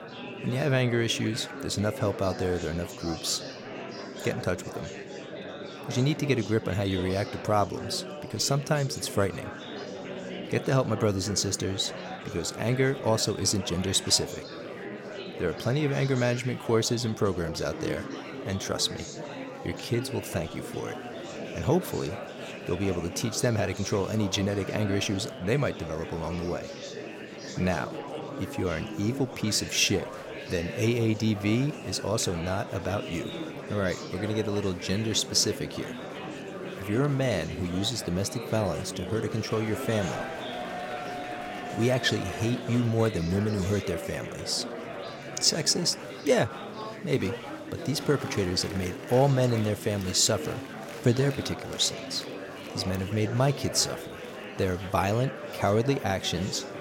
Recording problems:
murmuring crowd; loud; throughout; 10 dB below the speech

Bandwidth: 16.5 kHz